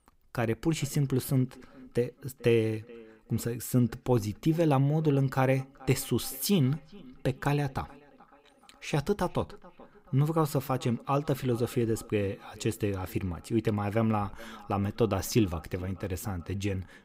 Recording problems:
echo of what is said; faint; throughout; 430 ms later, 25 dB below the speech

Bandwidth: 15.5 kHz